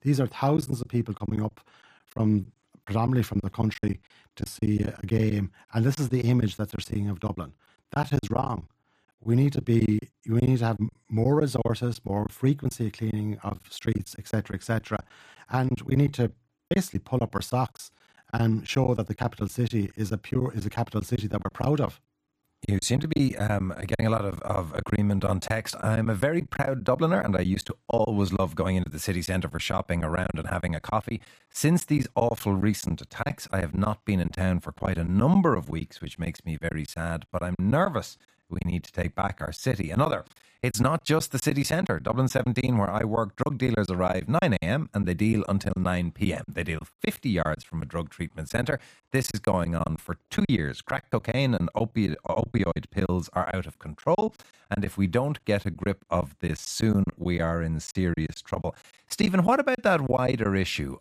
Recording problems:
choppy; very; 11% of the speech affected

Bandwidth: 14.5 kHz